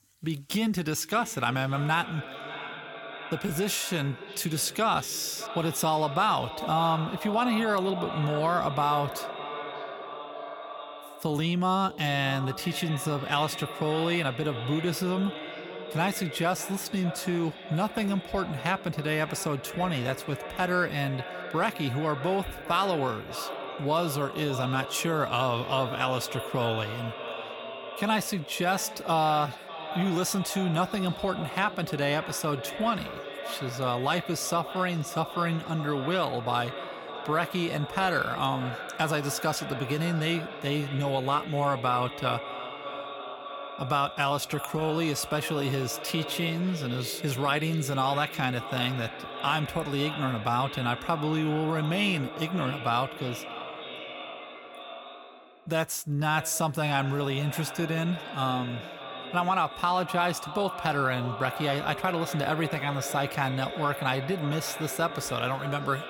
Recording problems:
echo of what is said; strong; throughout; 590 ms later, 10 dB below the speech

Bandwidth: 17 kHz